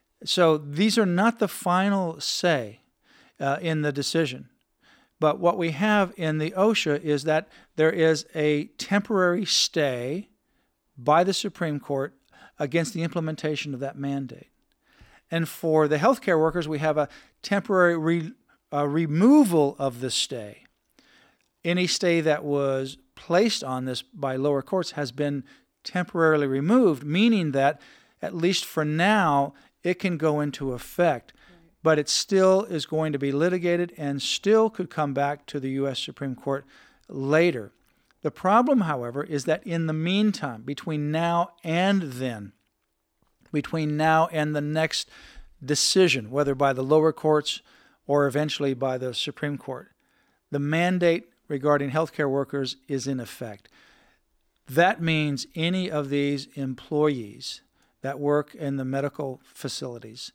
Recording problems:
none

